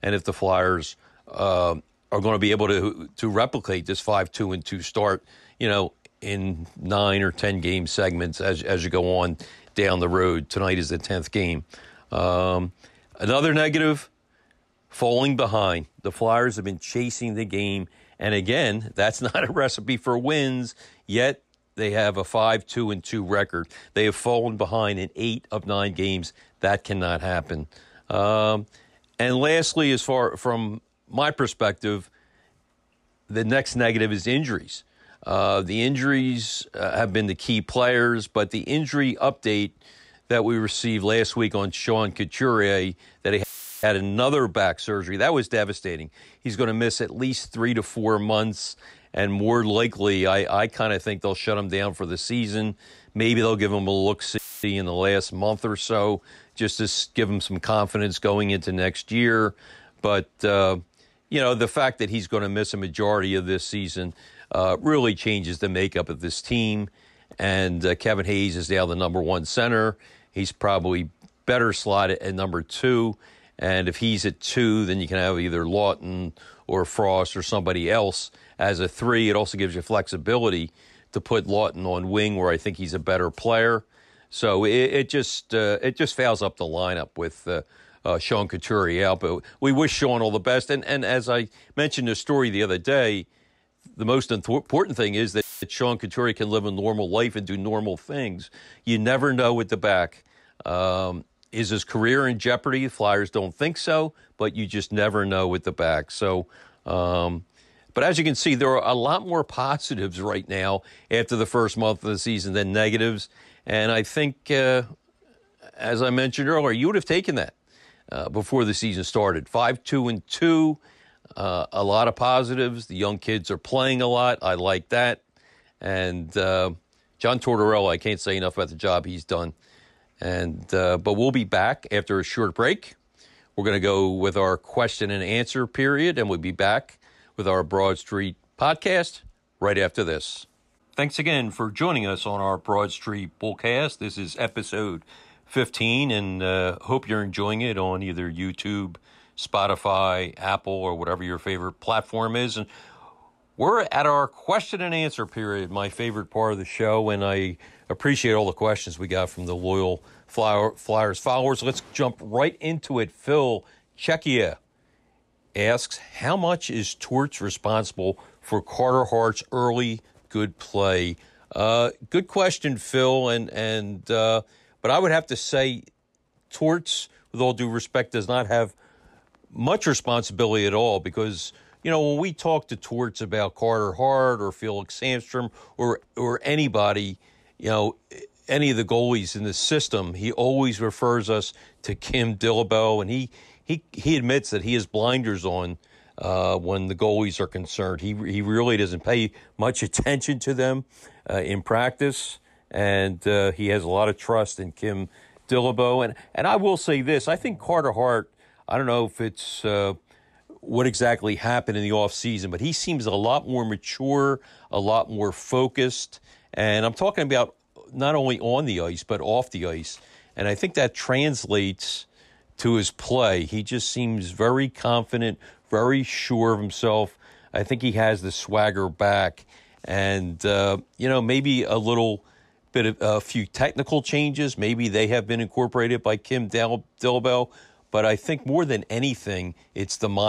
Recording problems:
audio cutting out; filled with static; at 43 s, at 54 s and at 1:35
abrupt cut into speech; at the end

